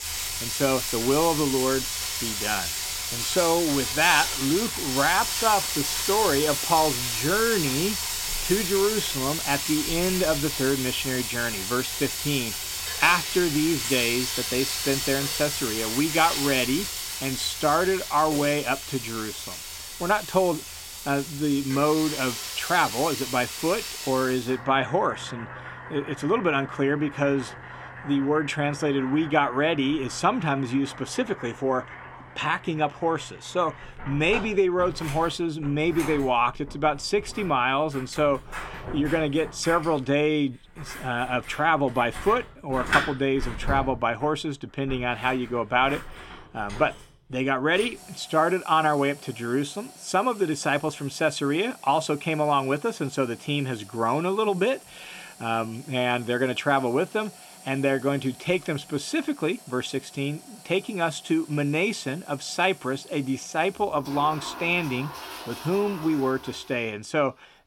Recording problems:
household noises; loud; throughout; 4 dB below the speech

